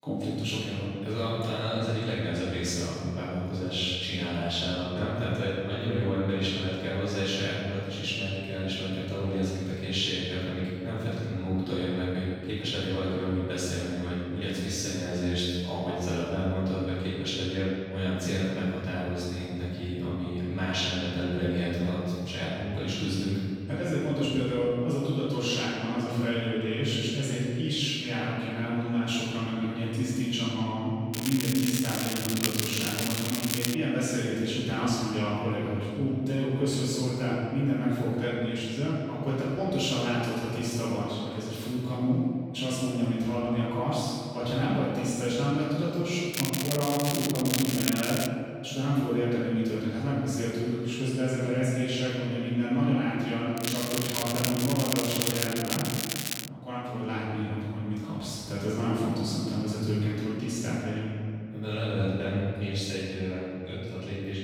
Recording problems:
room echo; strong; dies away in 2 s
off-mic speech; far
crackling; loud; from 31 to 34 s, from 46 to 48 s and from 54 to 56 s; 2 dB below the speech

